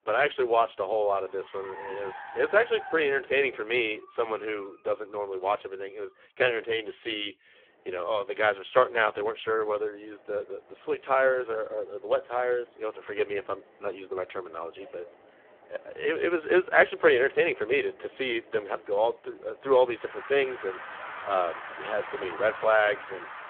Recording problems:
phone-call audio; poor line
traffic noise; noticeable; throughout; 15 dB below the speech

